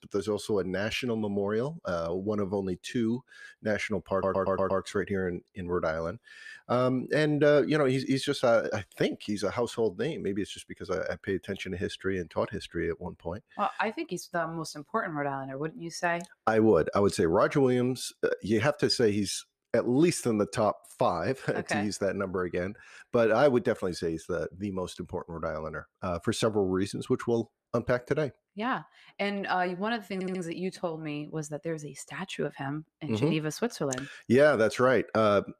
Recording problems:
audio stuttering; at 4 s and at 30 s

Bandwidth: 14.5 kHz